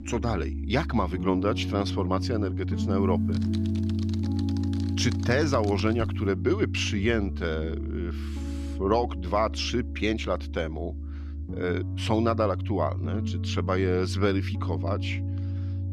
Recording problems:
background music; loud; throughout; 2 dB below the speech
keyboard typing; faint; from 3 to 6 s; peak 15 dB below the speech

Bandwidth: 15 kHz